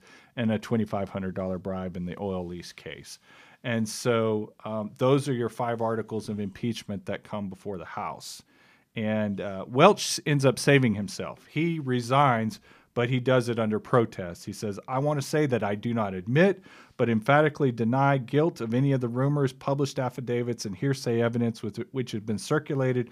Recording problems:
none

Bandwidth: 15 kHz